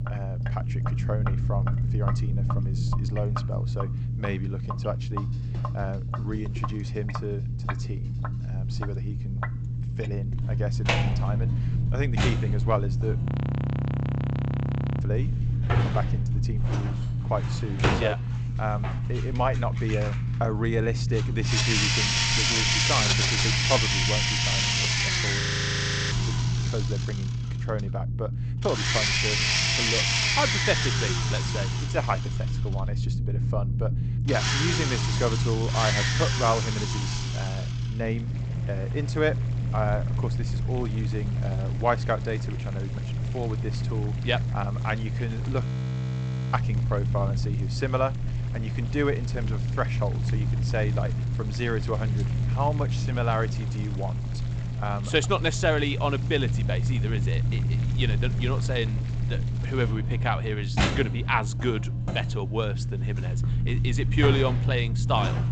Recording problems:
garbled, watery; slightly; nothing above 8 kHz
household noises; very loud; throughout; 4 dB above the speech
low rumble; loud; throughout; 9 dB below the speech
audio freezing; at 13 s for 2 s, at 25 s for 0.5 s and at 46 s for 1 s

